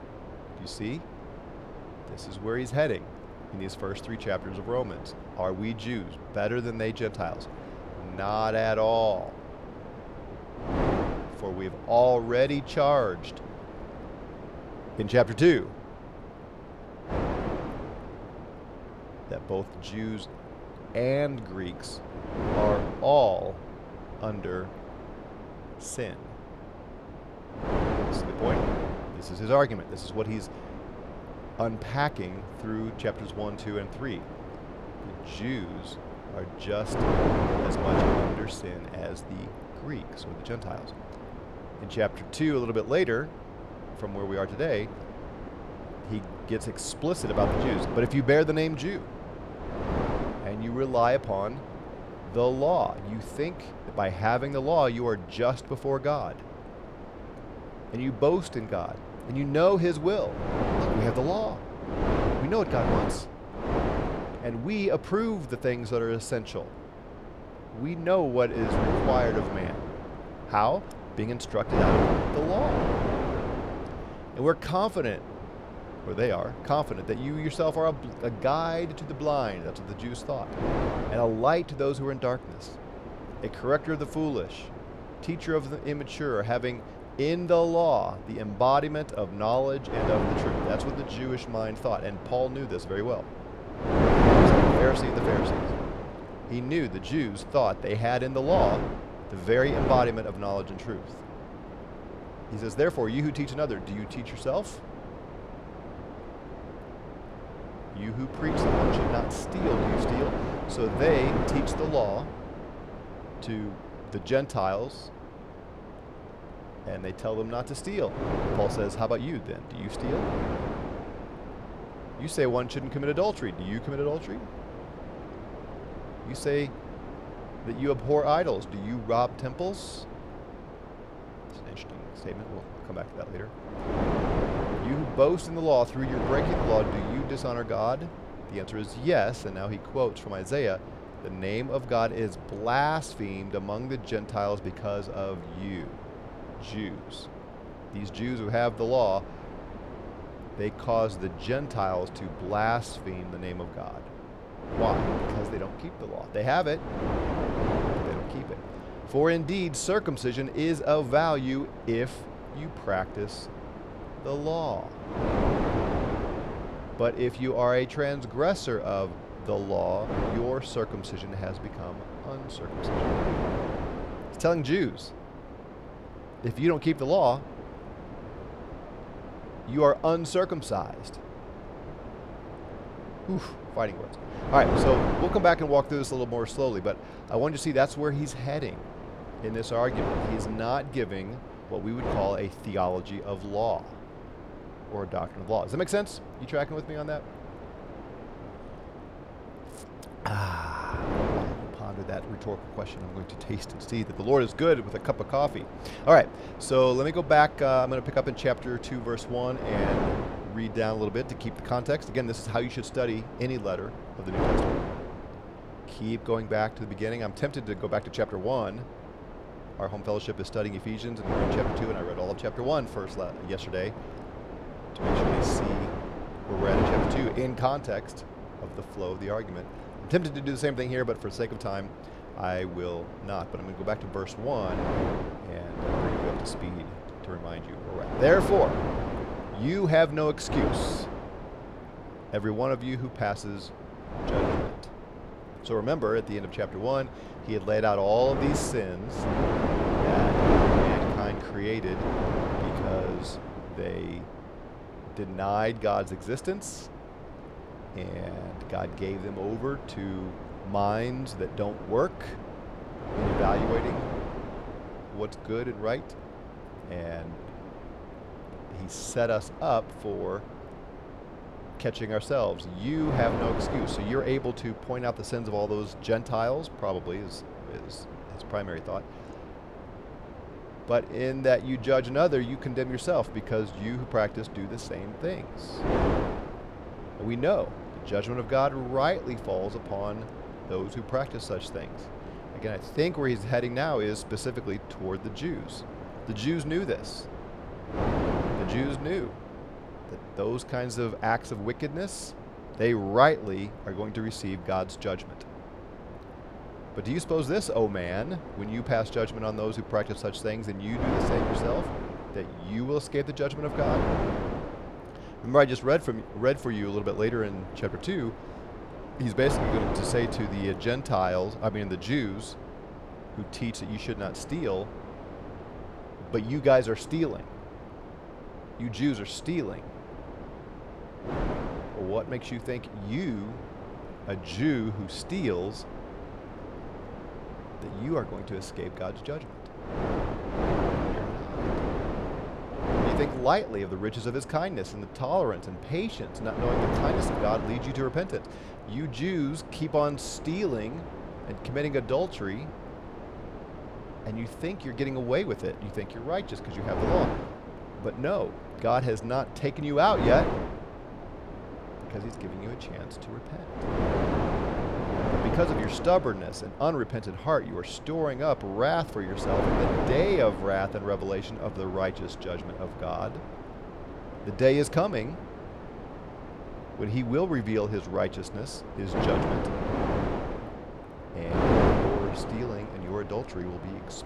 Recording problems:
wind noise on the microphone; heavy; 7 dB below the speech

